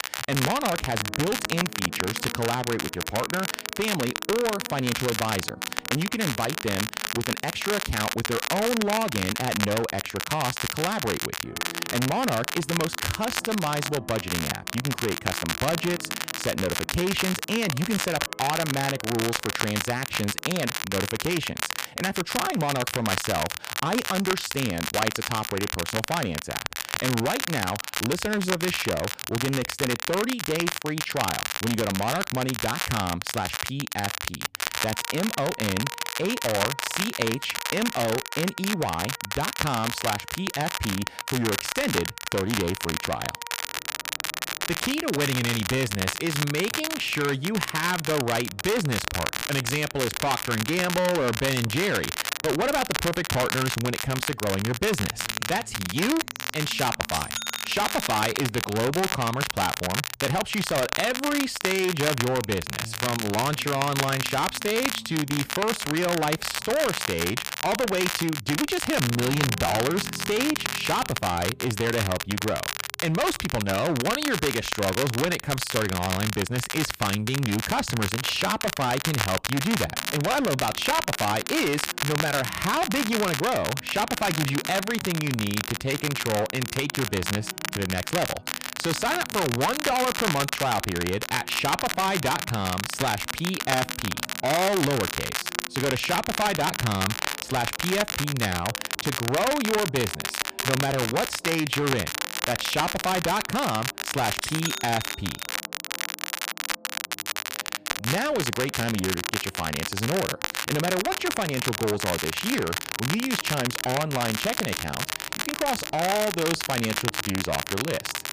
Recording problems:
distortion; heavy; 13% of the sound clipped
crackle, like an old record; loud; 2 dB below the speech
background music; faint; throughout; 20 dB below the speech

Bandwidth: 15 kHz